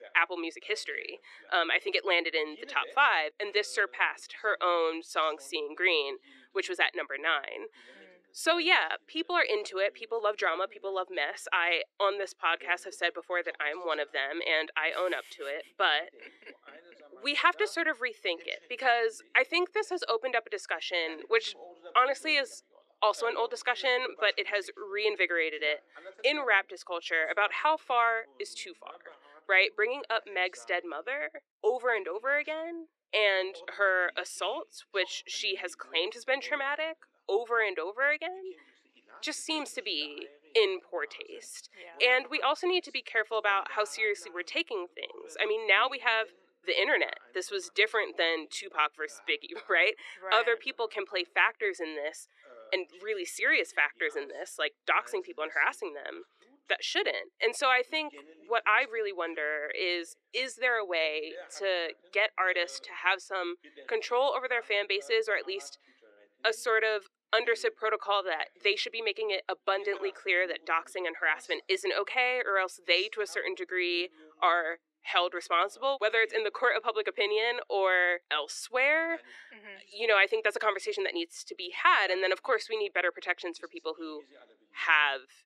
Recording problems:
thin; very; fading below 350 Hz
voice in the background; faint; throughout; 25 dB below the speech

